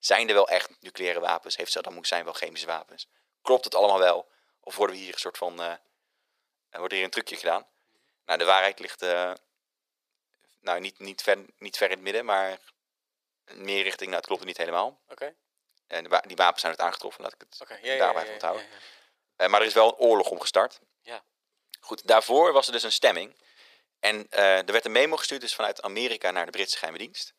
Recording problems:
thin; very; fading below 450 Hz

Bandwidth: 15 kHz